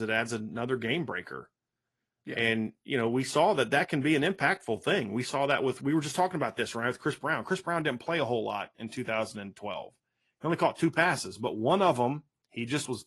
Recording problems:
garbled, watery; slightly; nothing above 11.5 kHz
abrupt cut into speech; at the start

